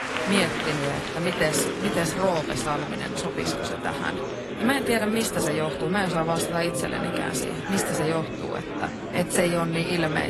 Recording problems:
garbled, watery; slightly; nothing above 11.5 kHz
murmuring crowd; loud; throughout; 3 dB below the speech
abrupt cut into speech; at the end

